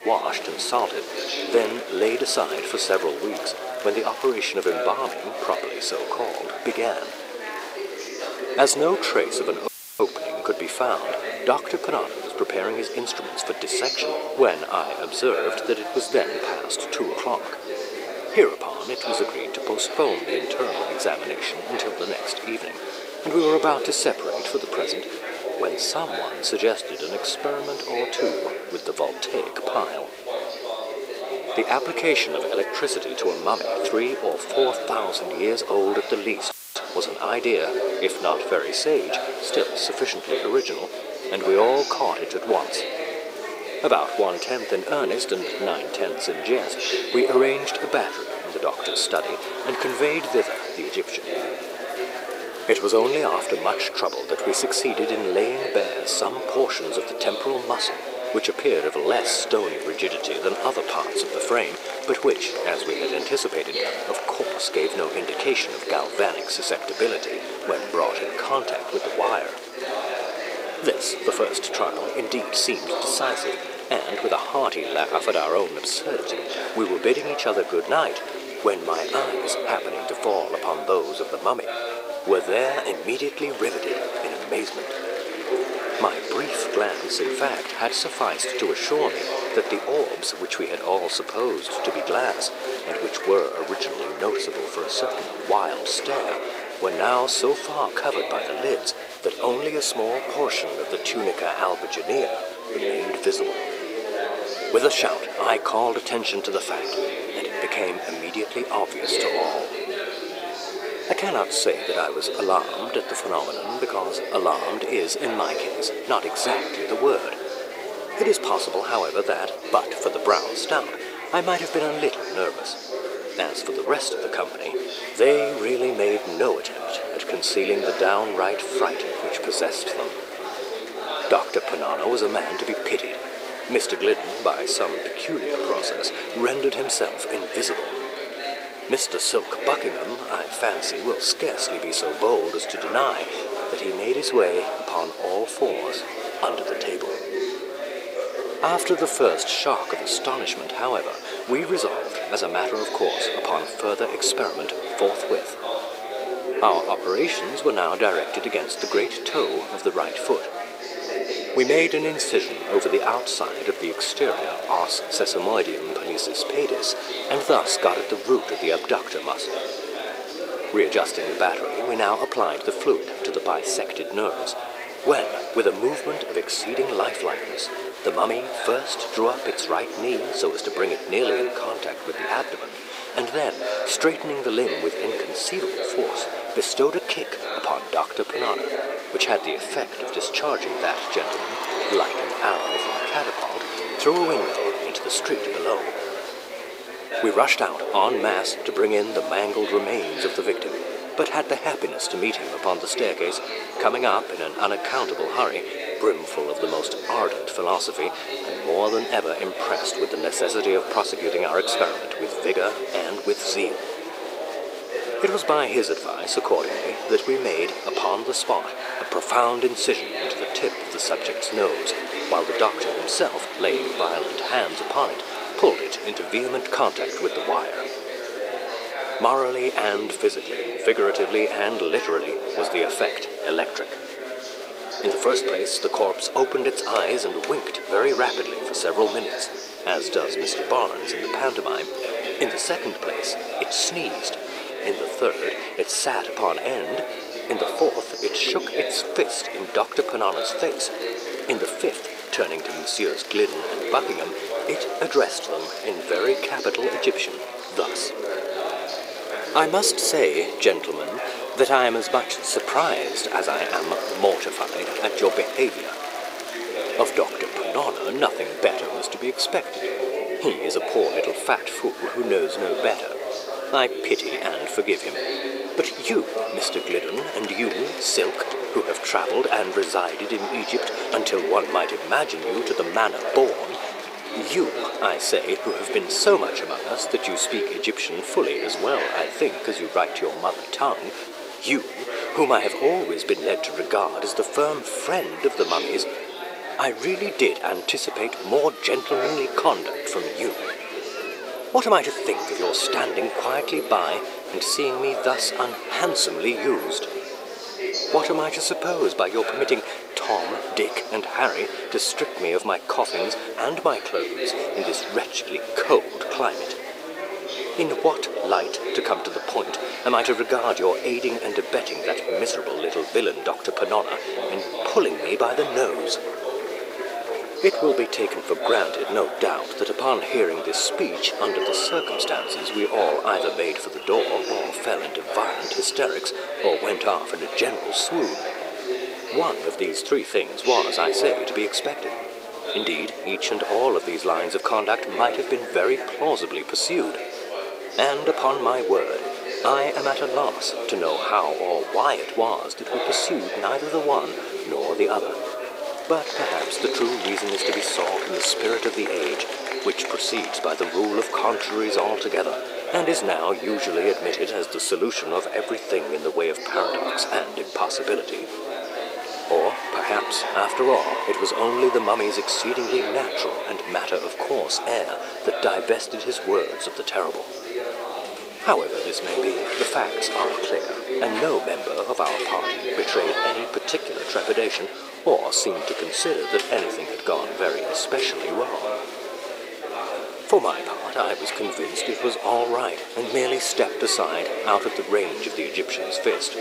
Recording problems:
thin; very; fading below 350 Hz
chatter from many people; loud; throughout; 5 dB below the speech
hiss; faint; throughout; 30 dB below the speech
audio cutting out; filled with static; at 9.5 s and at 37 s

